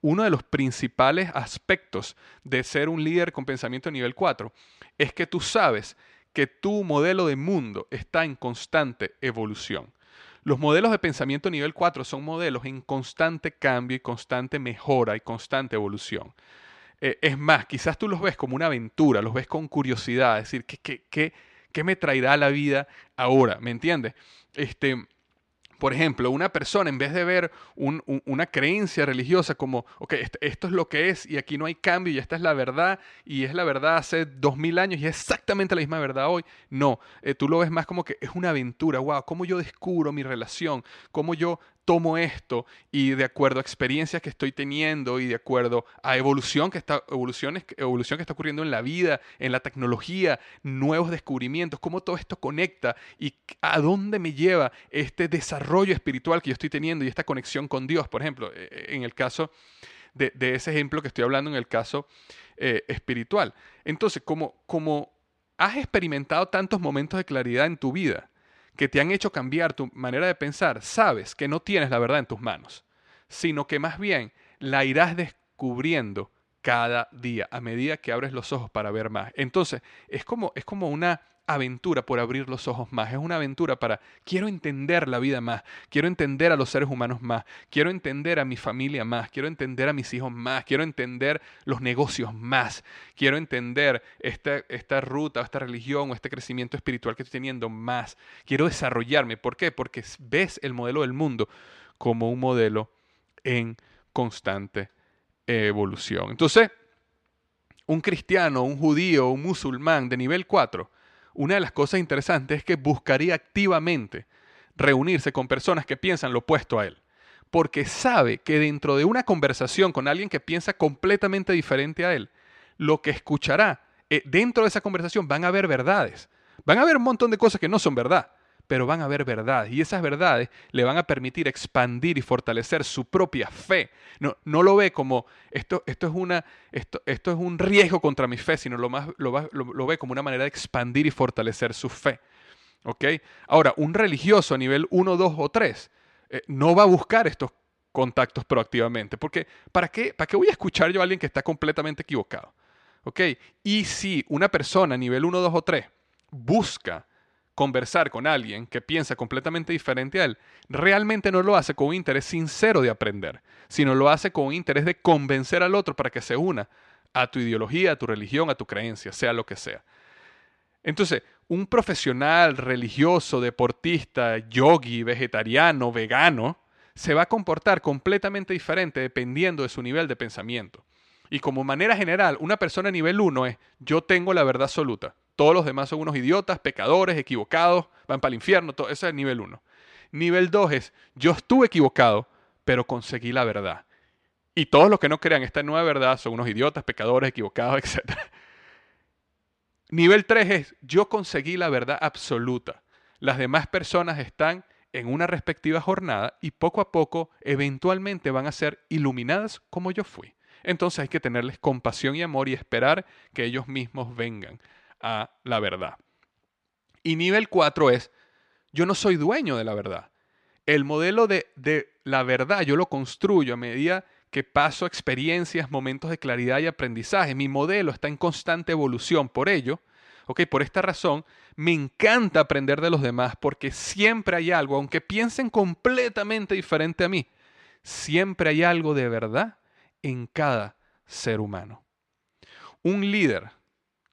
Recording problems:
none

